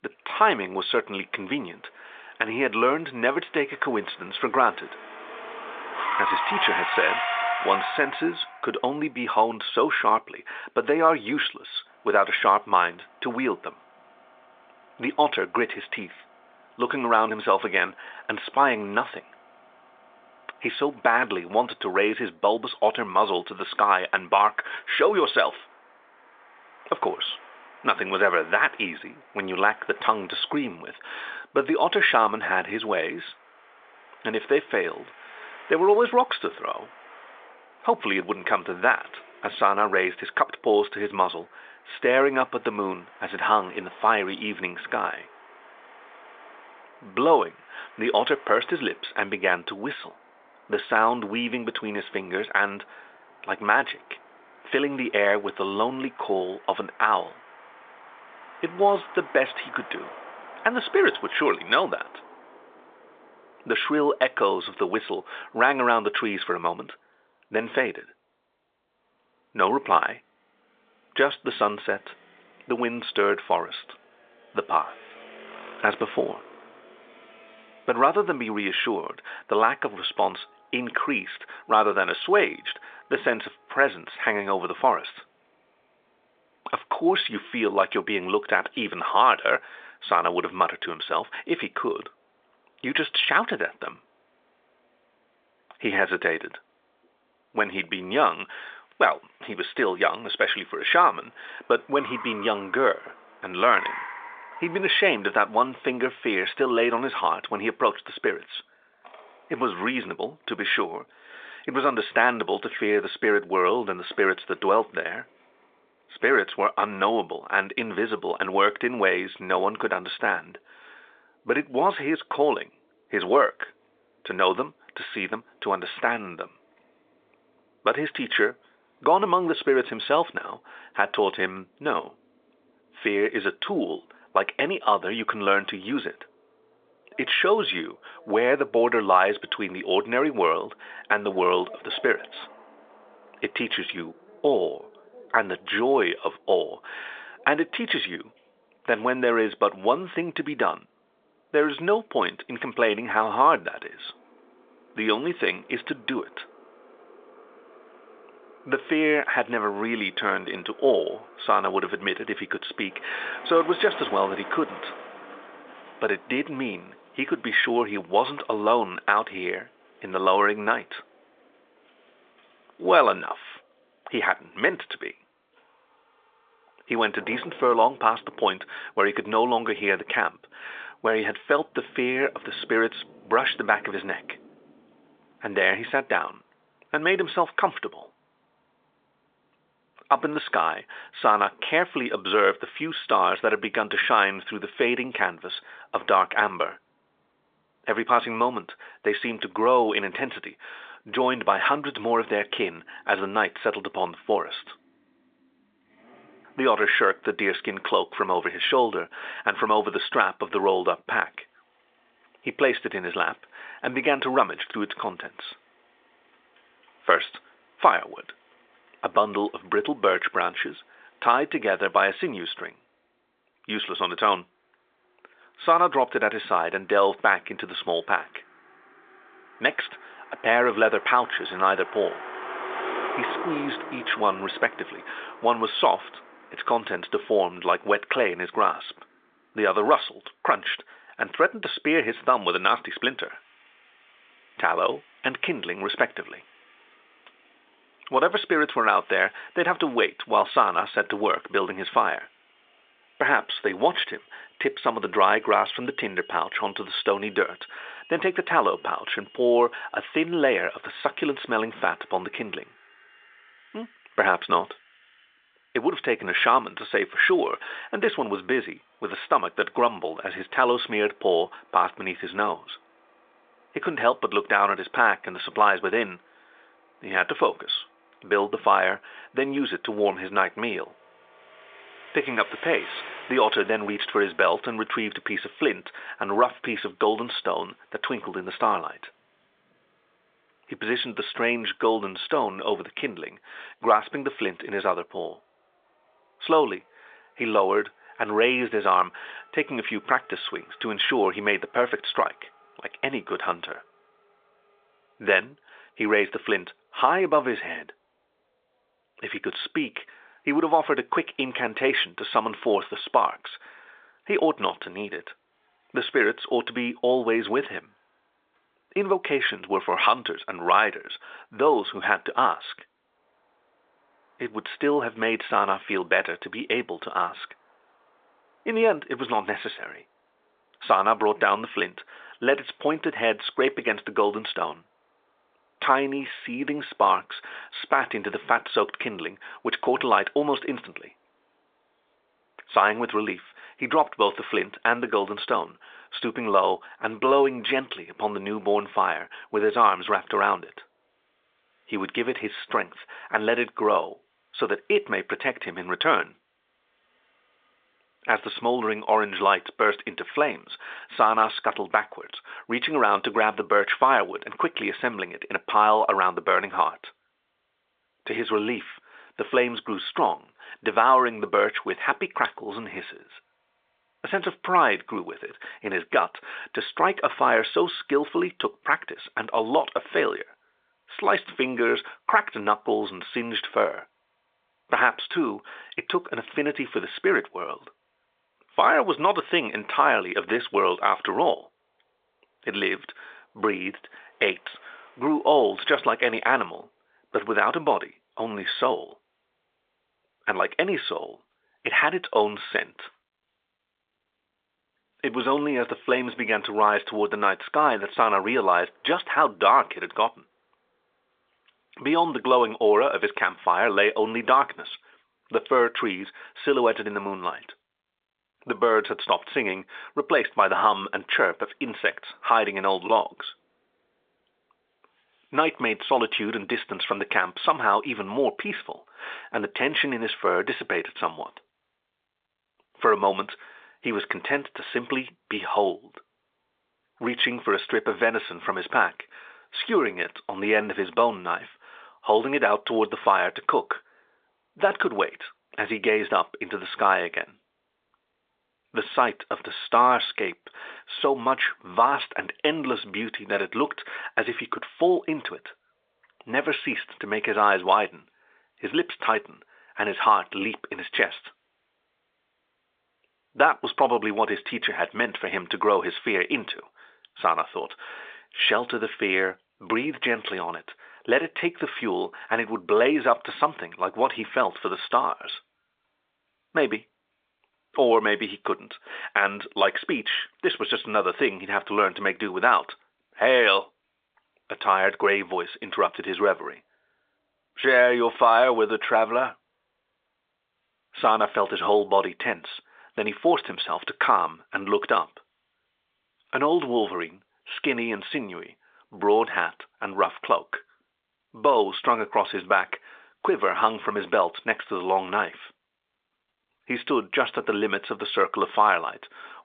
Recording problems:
phone-call audio
traffic noise; noticeable; throughout; 15 dB below the speech

